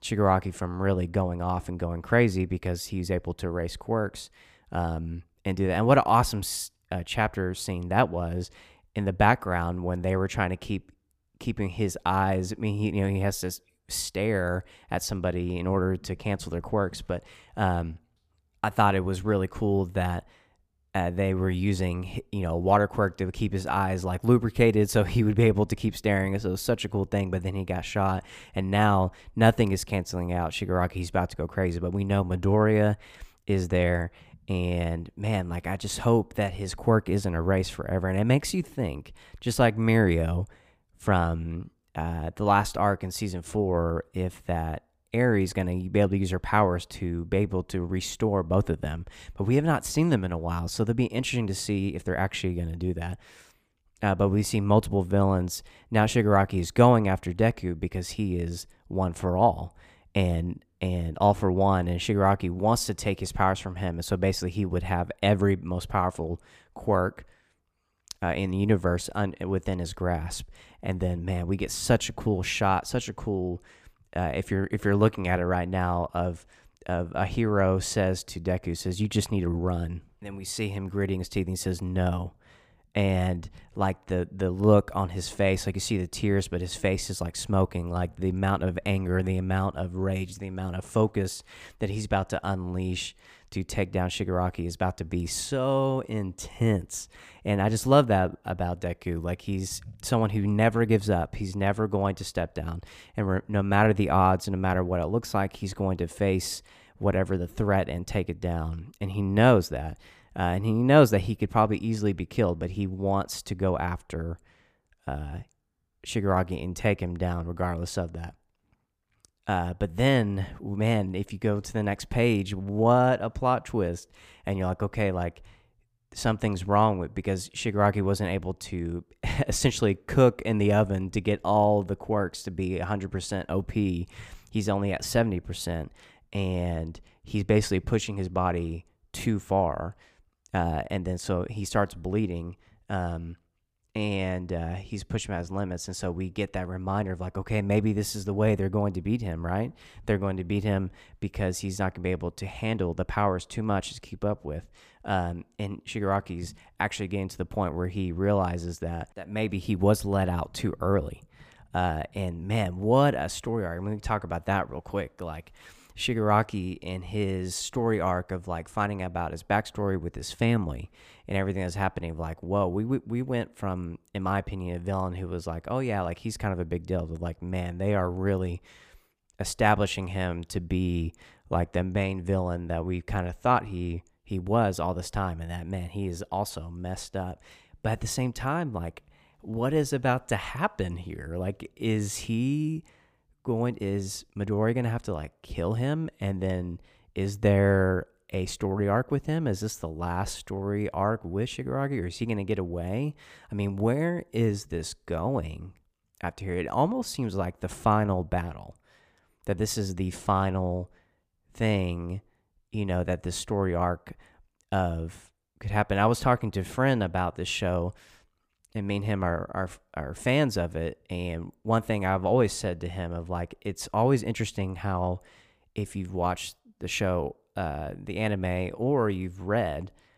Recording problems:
none

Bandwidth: 15 kHz